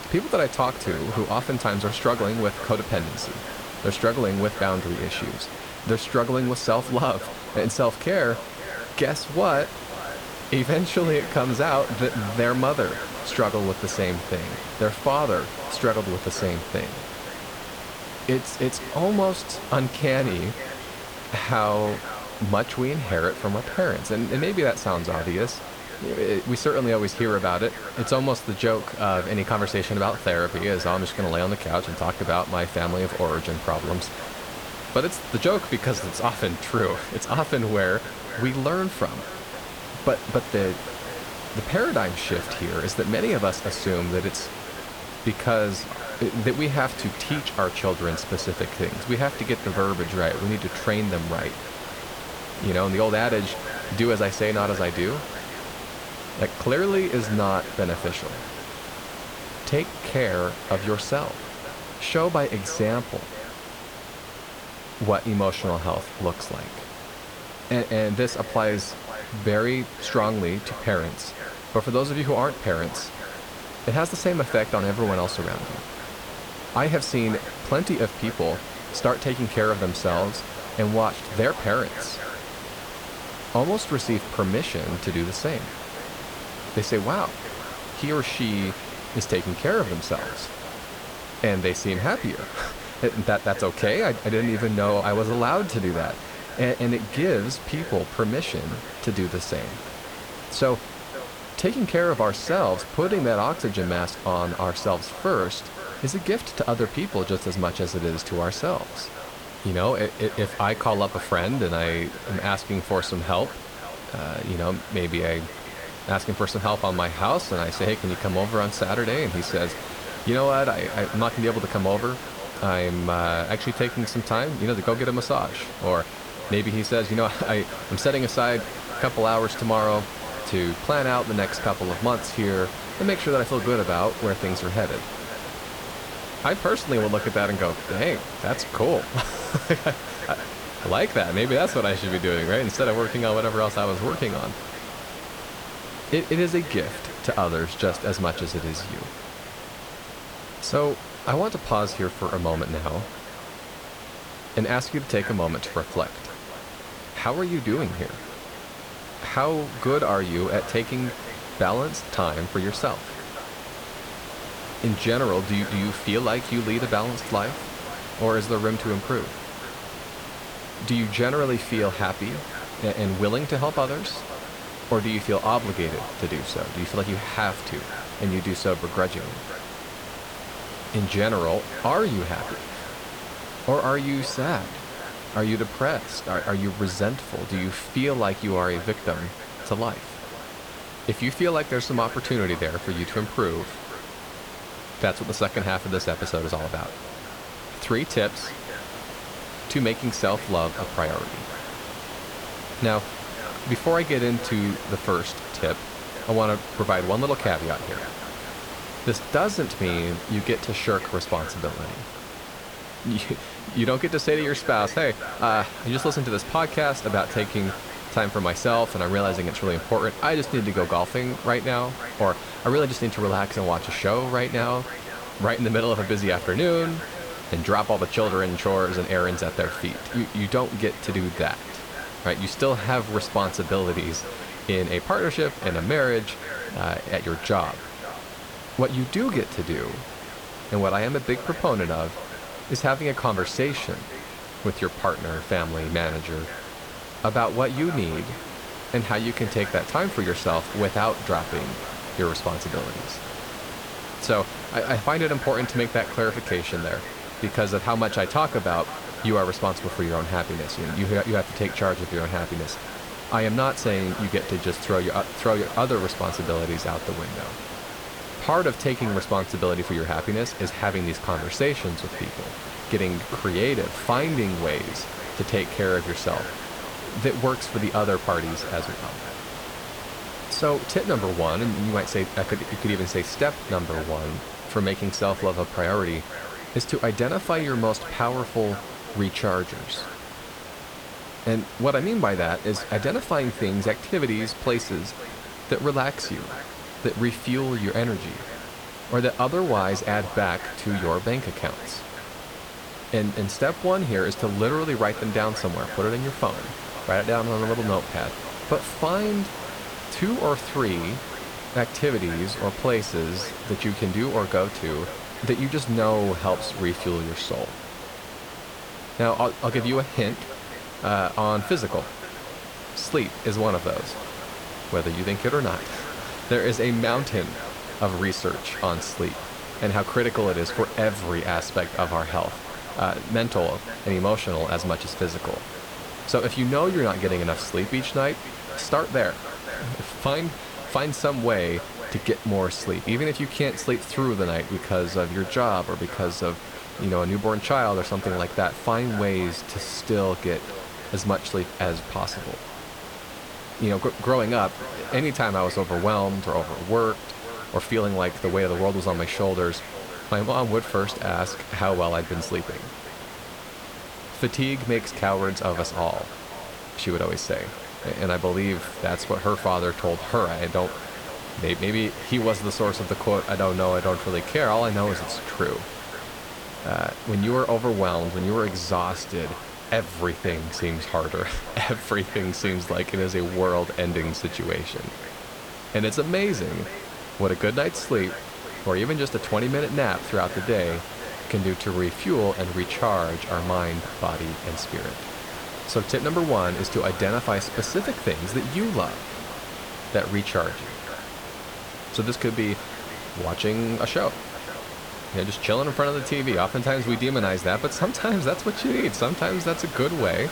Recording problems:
echo of what is said; noticeable; throughout; 520 ms later, 15 dB below the speech
hiss; noticeable; throughout; 10 dB below the speech

